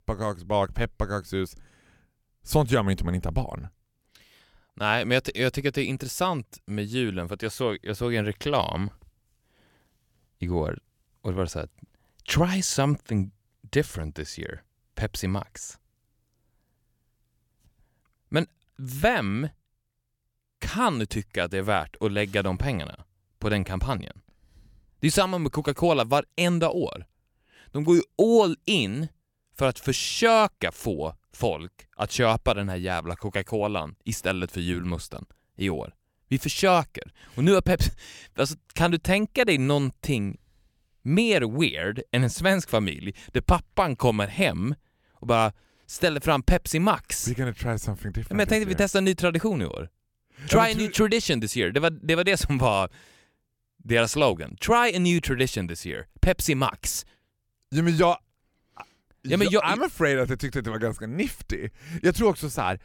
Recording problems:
none

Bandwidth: 17 kHz